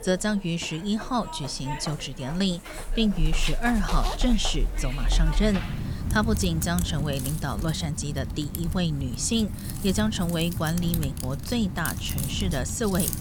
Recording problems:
household noises; loud; throughout; 4 dB below the speech

